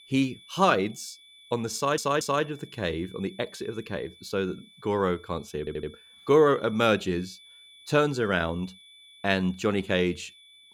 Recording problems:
high-pitched whine; faint; throughout; 3.5 kHz, 25 dB below the speech
audio stuttering; at 2 s and at 5.5 s

